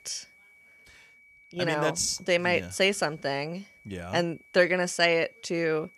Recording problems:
high-pitched whine; faint; throughout; 2.5 kHz, 30 dB below the speech

